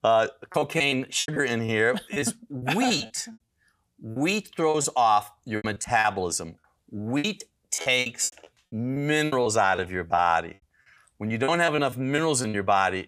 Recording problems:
choppy; very; 13% of the speech affected

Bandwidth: 15 kHz